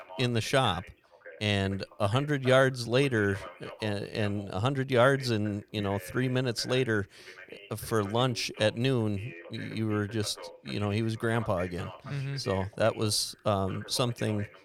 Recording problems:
voice in the background; noticeable; throughout; 15 dB below the speech

